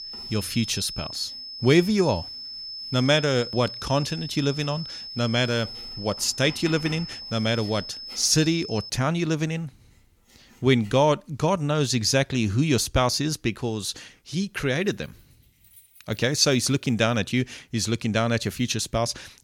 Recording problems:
high-pitched whine; noticeable; until 9 s; 5 kHz, 10 dB below the speech
household noises; faint; throughout; 25 dB below the speech

